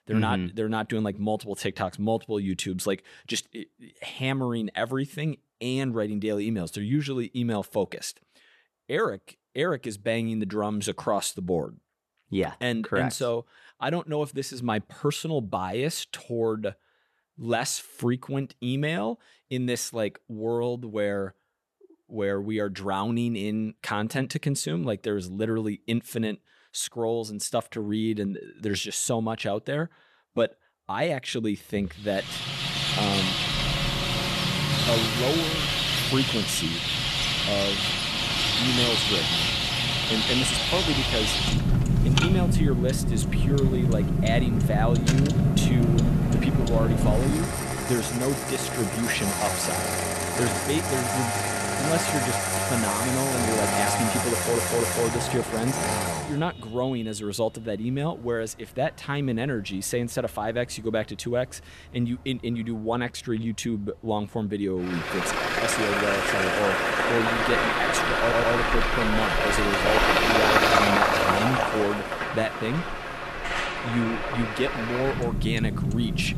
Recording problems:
traffic noise; very loud; from 32 s on; 5 dB above the speech
audio stuttering; at 54 s and at 1:08

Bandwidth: 13.5 kHz